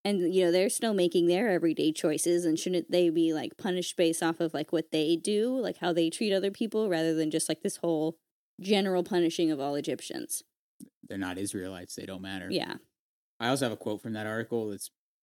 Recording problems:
none

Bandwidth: 18.5 kHz